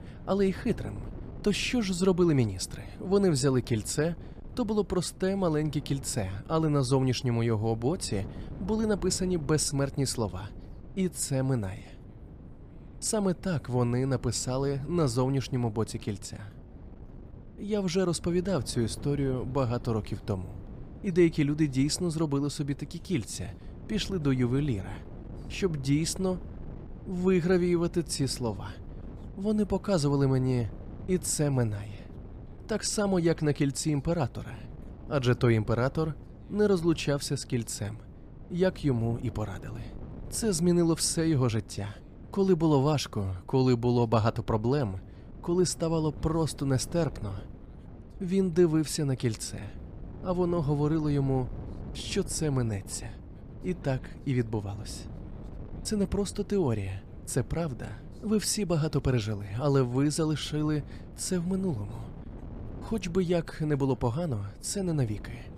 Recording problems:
wind noise on the microphone; occasional gusts; 20 dB below the speech

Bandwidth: 15 kHz